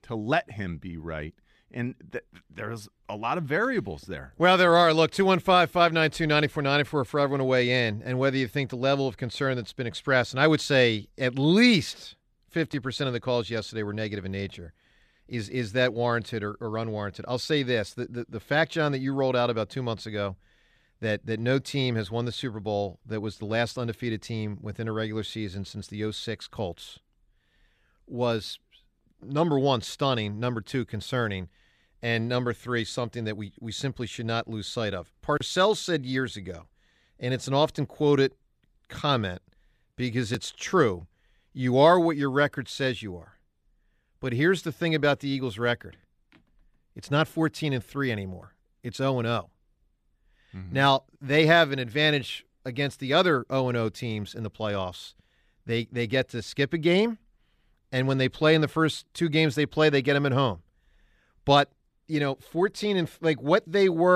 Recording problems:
abrupt cut into speech; at the end

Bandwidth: 14.5 kHz